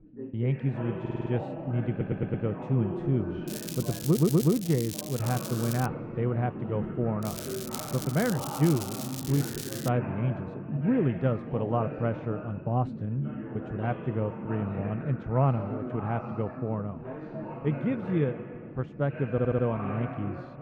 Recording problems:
muffled; very; fading above 1 kHz
background chatter; loud; throughout; 4 voices, 8 dB below the speech
crackling; loud; from 3.5 to 6 s and from 7 to 10 s; 9 dB below the speech
audio stuttering; 4 times, first at 1 s

